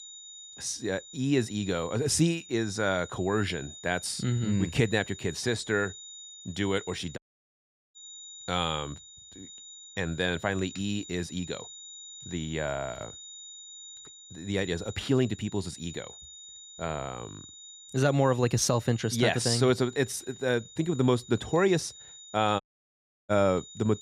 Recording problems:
high-pitched whine; noticeable; throughout; 4 kHz, 15 dB below the speech
audio cutting out; at 7 s for 1 s and at 23 s for 0.5 s

